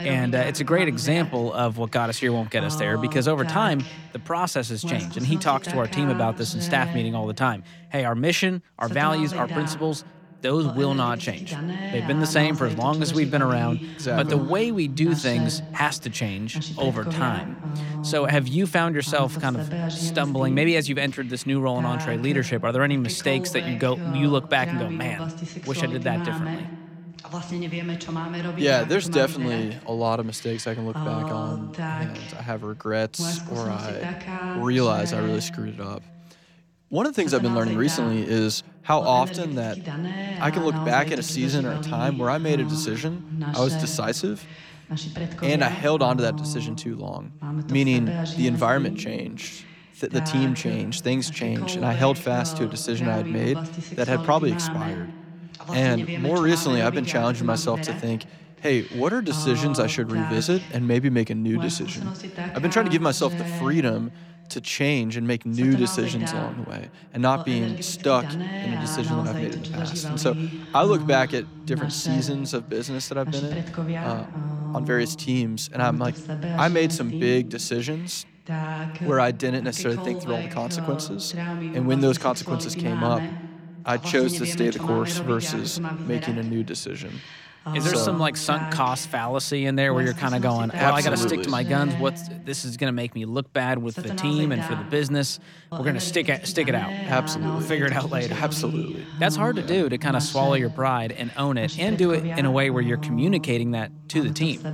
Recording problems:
voice in the background; loud; throughout; 6 dB below the speech

